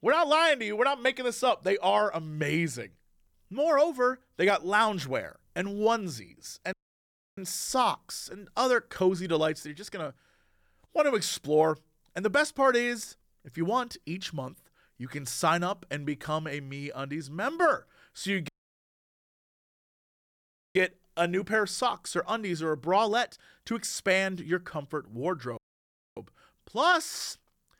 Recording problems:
audio cutting out; at 6.5 s for 0.5 s, at 18 s for 2.5 s and at 26 s for 0.5 s

